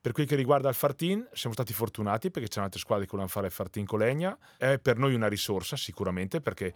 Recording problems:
none

